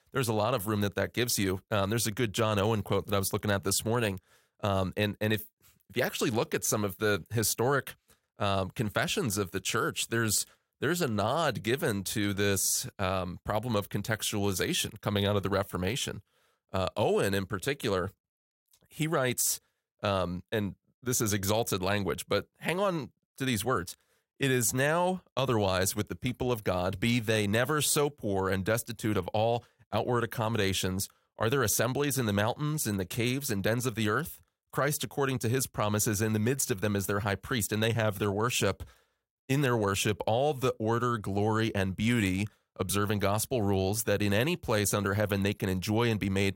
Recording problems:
none

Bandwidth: 16 kHz